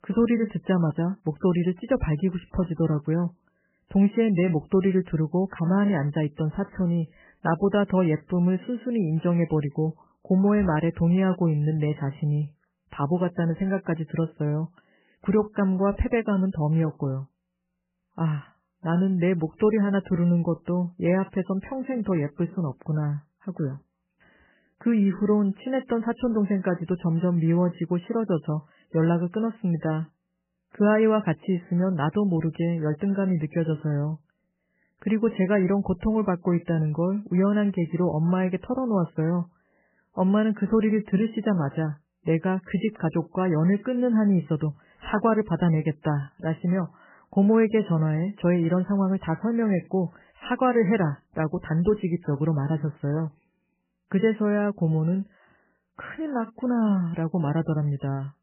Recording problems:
garbled, watery; badly; nothing above 3 kHz

